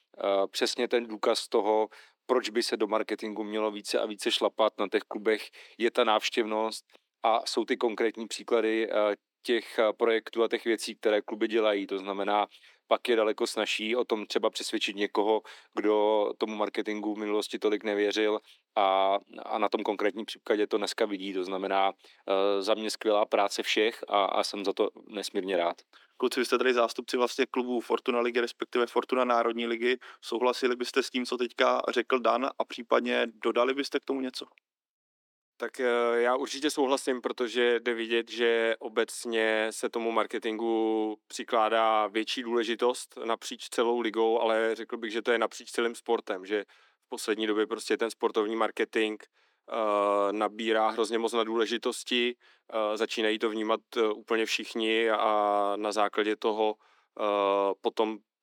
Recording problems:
thin; somewhat; fading below 300 Hz

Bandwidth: 18.5 kHz